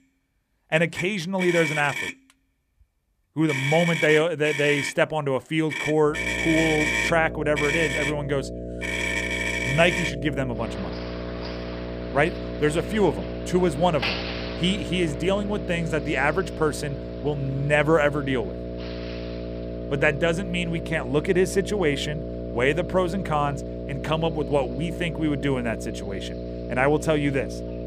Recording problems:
traffic noise; loud; throughout; 4 dB below the speech
electrical hum; noticeable; from 6 s on; 60 Hz, 10 dB below the speech

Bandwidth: 15 kHz